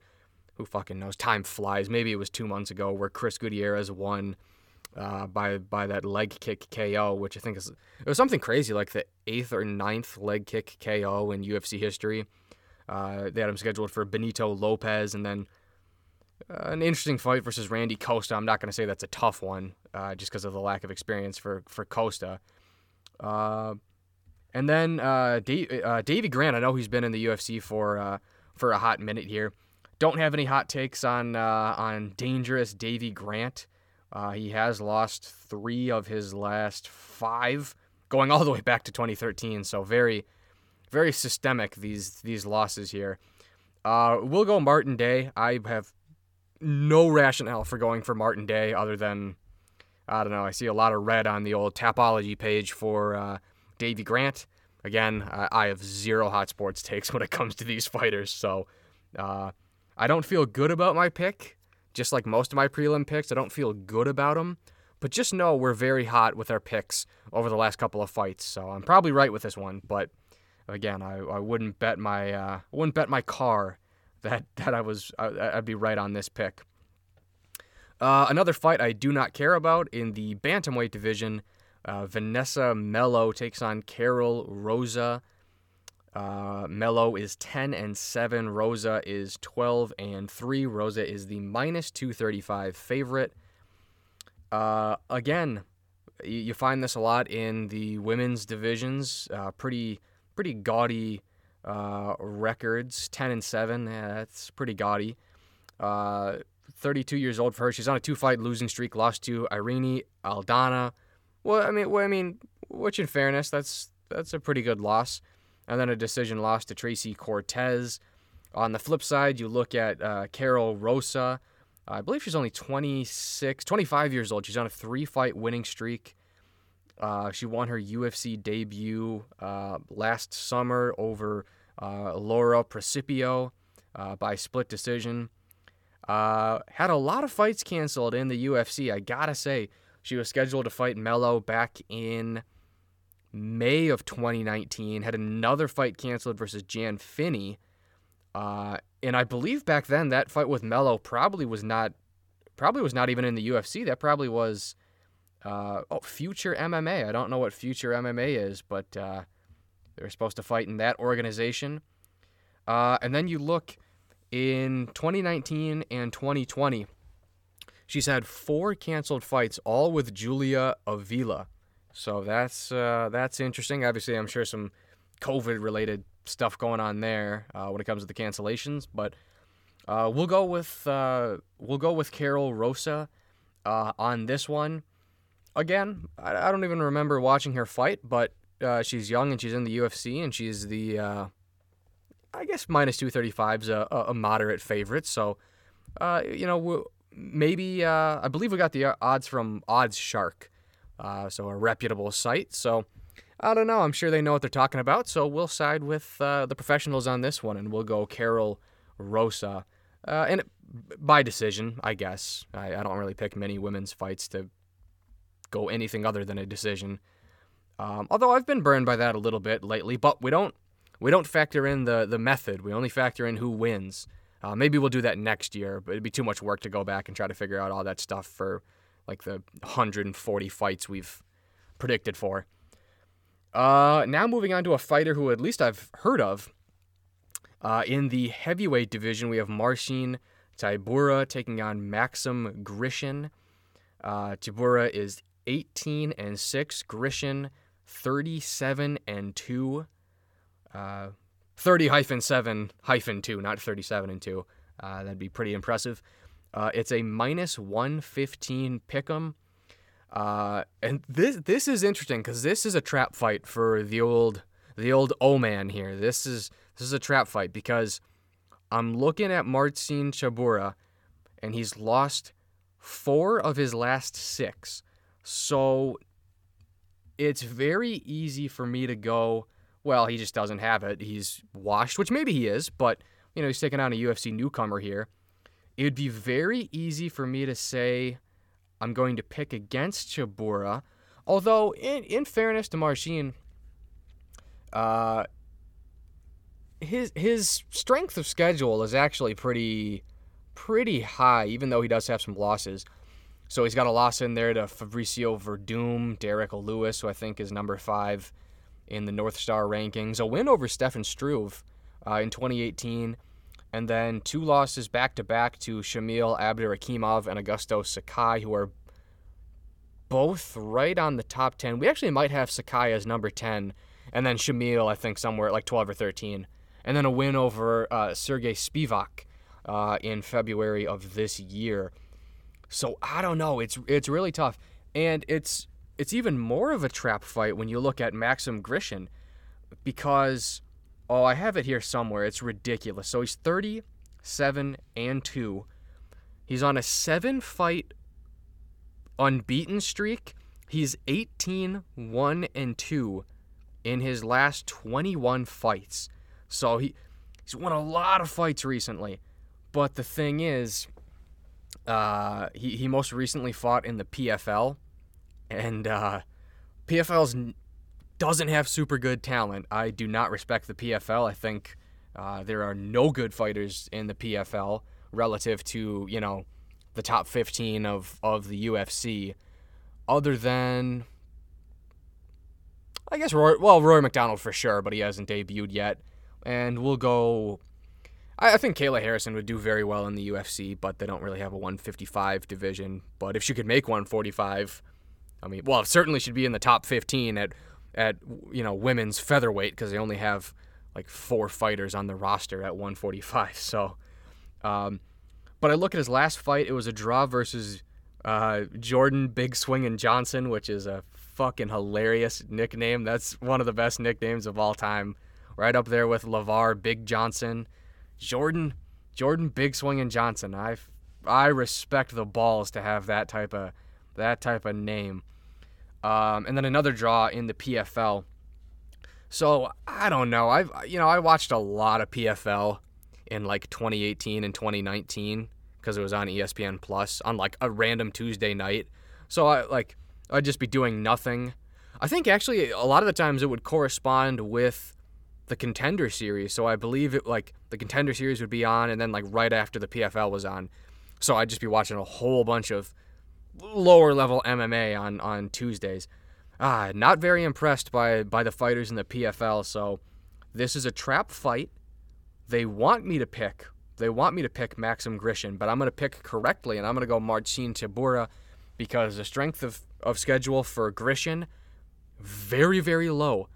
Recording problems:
none

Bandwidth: 17.5 kHz